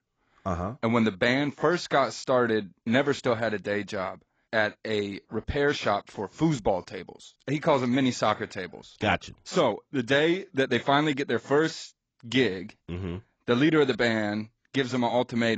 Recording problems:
garbled, watery; badly; nothing above 7.5 kHz
abrupt cut into speech; at the end

